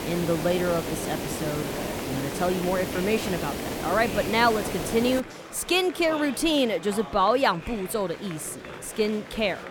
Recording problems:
hiss; loud; until 5 s; 6 dB below the speech
murmuring crowd; noticeable; throughout; 15 dB below the speech

